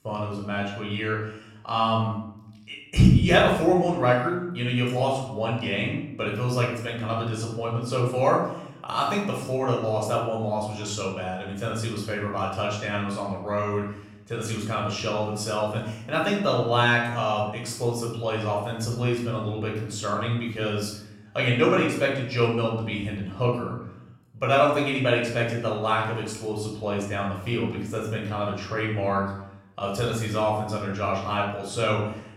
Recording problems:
off-mic speech; far
room echo; noticeable; dies away in 0.7 s

